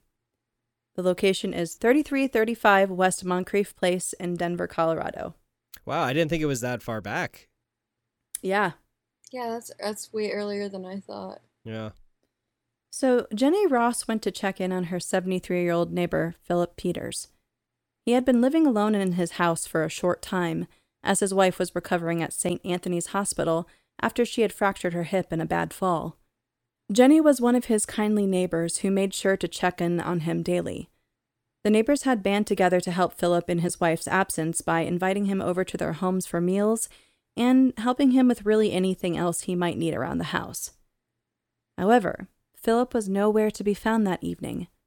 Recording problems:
none

